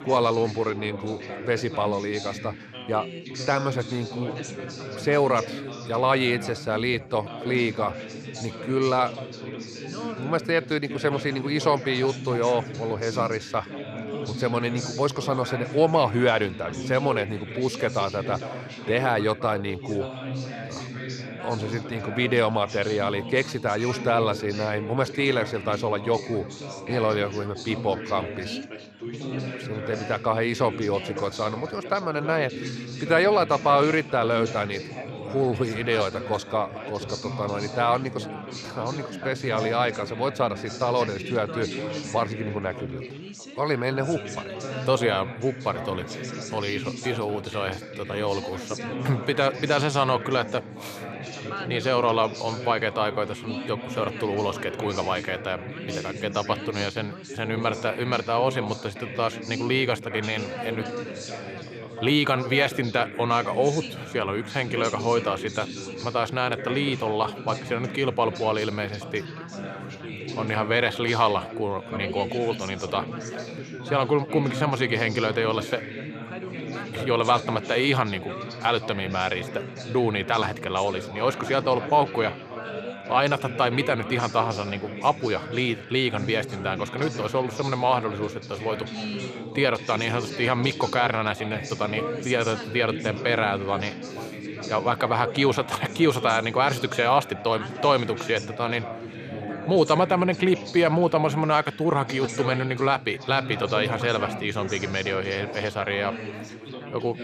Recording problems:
background chatter; loud; throughout; 4 voices, 9 dB below the speech

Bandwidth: 14.5 kHz